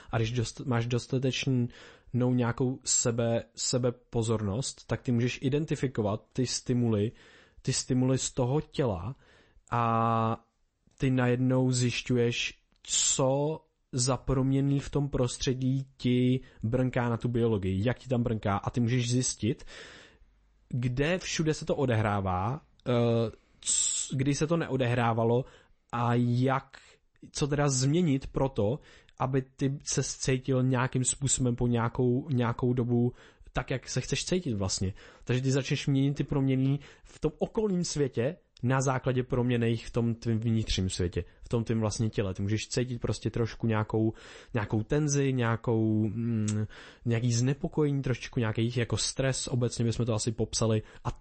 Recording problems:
garbled, watery; slightly; nothing above 8 kHz

